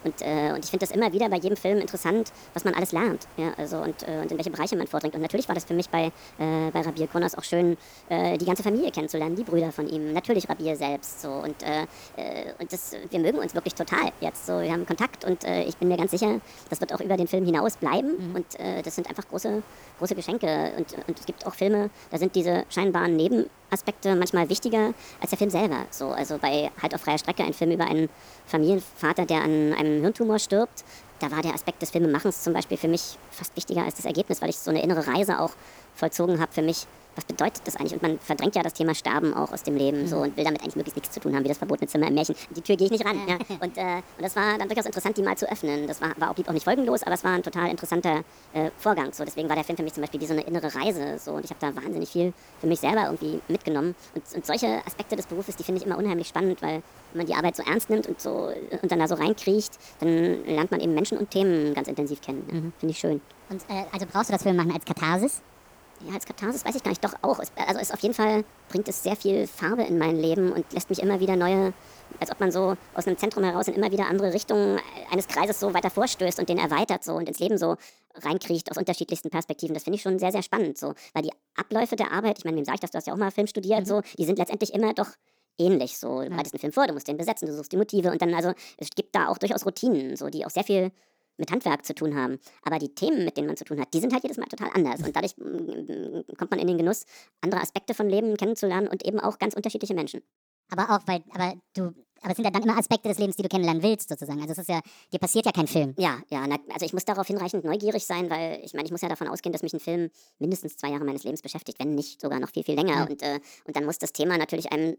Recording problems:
wrong speed and pitch; too fast and too high; 1.5 times normal speed
hiss; faint; until 1:17; 25 dB below the speech

